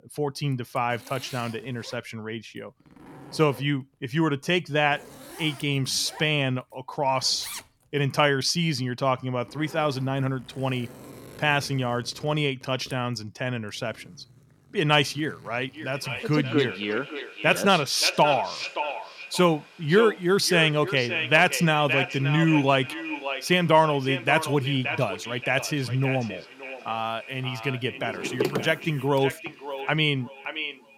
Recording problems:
echo of what is said; strong; from 16 s on; 570 ms later, 8 dB below the speech
household noises; noticeable; throughout; 20 dB below the speech

